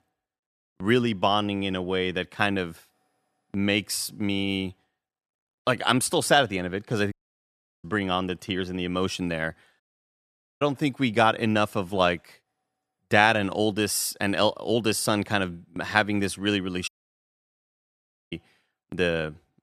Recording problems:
audio cutting out; at 7 s for 0.5 s, at 10 s for 1 s and at 17 s for 1.5 s

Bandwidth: 14 kHz